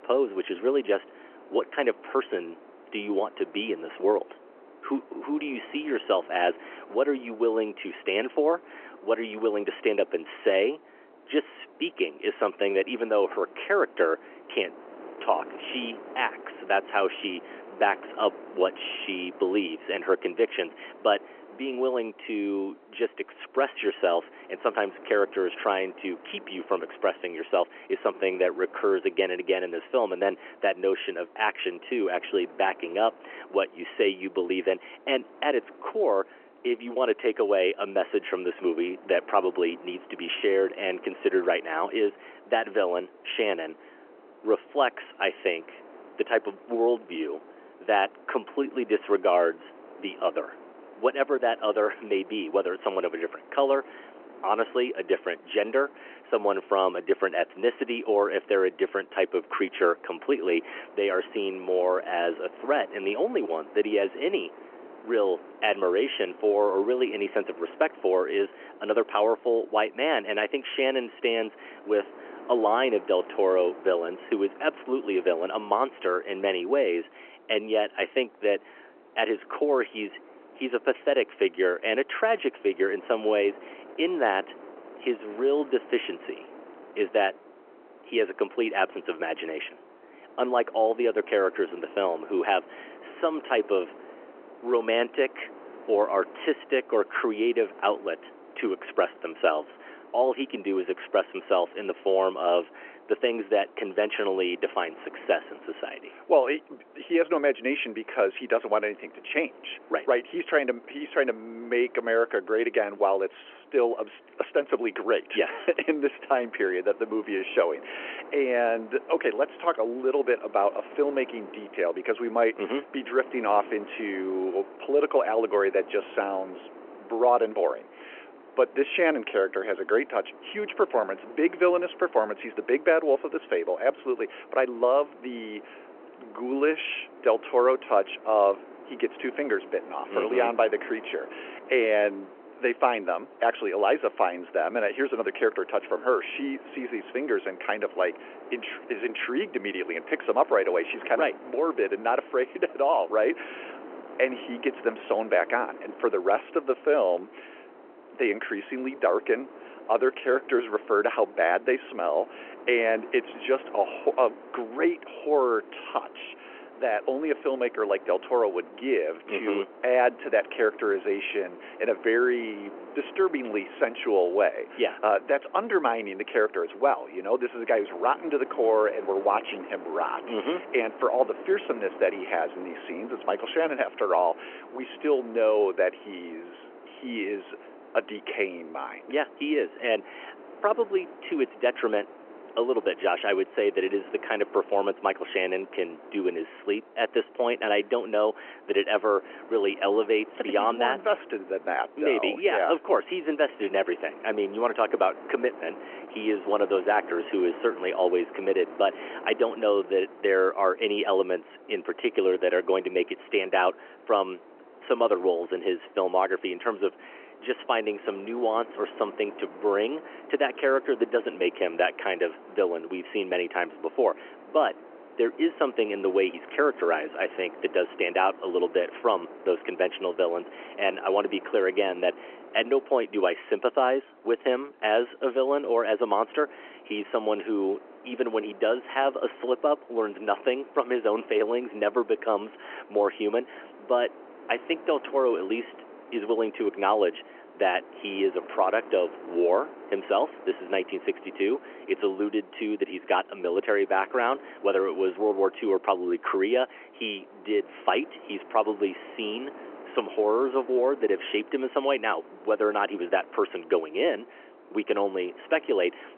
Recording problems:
phone-call audio
wind noise on the microphone; occasional gusts; 20 dB below the speech

